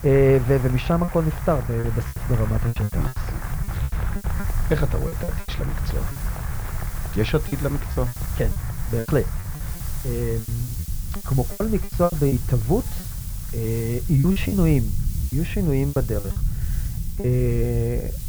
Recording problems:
muffled; slightly; fading above 2.5 kHz
crowd noise; noticeable; throughout; 15 dB below the speech
hiss; noticeable; throughout; 15 dB below the speech
low rumble; noticeable; throughout; 15 dB below the speech
choppy; very; 13% of the speech affected

